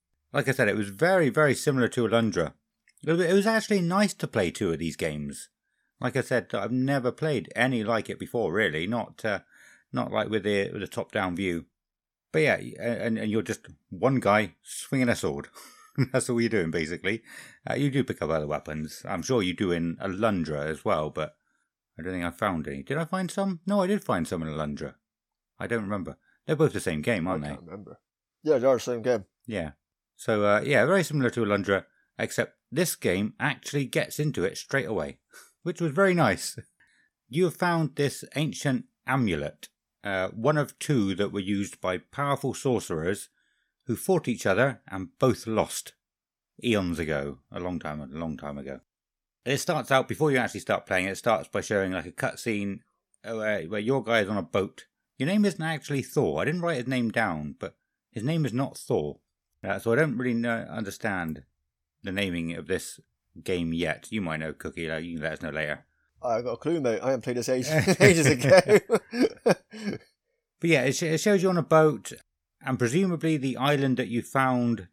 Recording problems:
none

